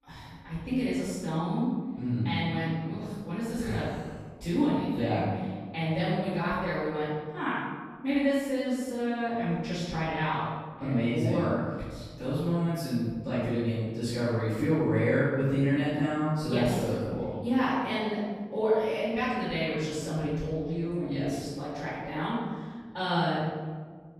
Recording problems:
room echo; strong; dies away in 1.5 s
off-mic speech; far

